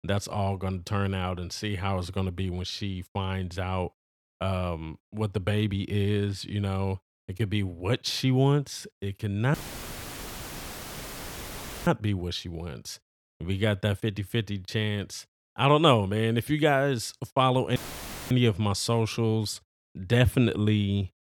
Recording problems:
audio cutting out; filled with static; at 9.5 s for 2.5 s and at 18 s for 0.5 s

